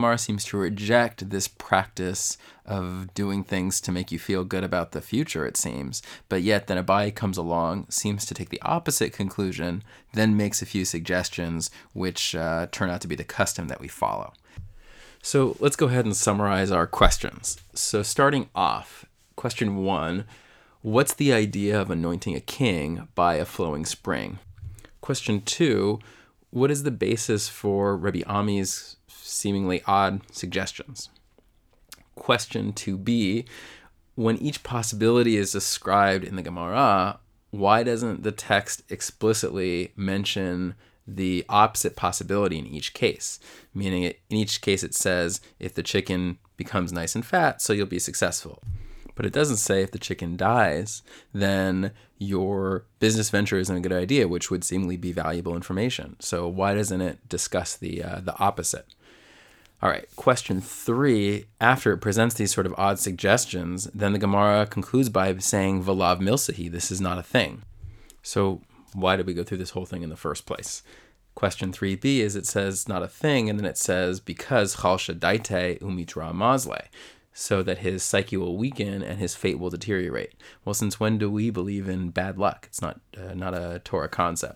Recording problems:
abrupt cut into speech; at the start

